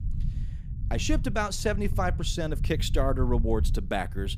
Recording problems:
low rumble; noticeable; throughout; 15 dB below the speech

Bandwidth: 15.5 kHz